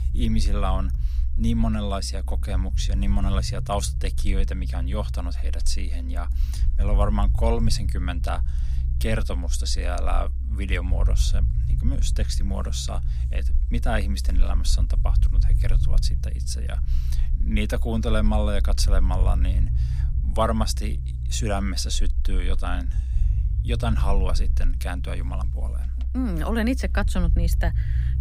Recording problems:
low rumble; noticeable; throughout; 15 dB below the speech

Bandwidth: 15.5 kHz